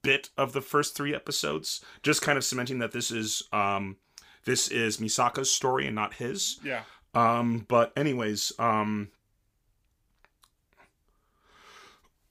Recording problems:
none

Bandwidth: 15 kHz